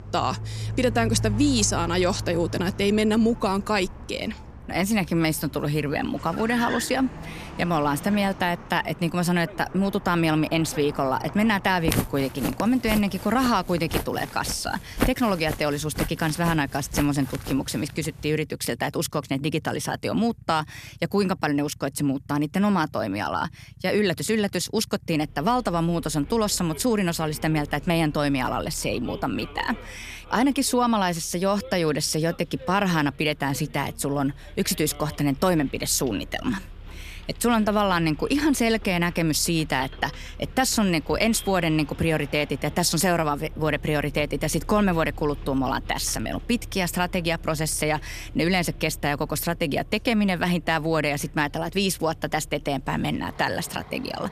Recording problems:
traffic noise; noticeable; throughout; 15 dB below the speech
footsteps; noticeable; from 12 to 18 s; peak 2 dB below the speech

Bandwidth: 14.5 kHz